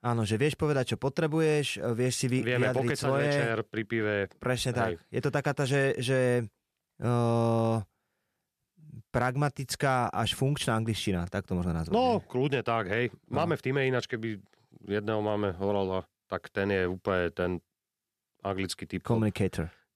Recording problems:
none

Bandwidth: 14.5 kHz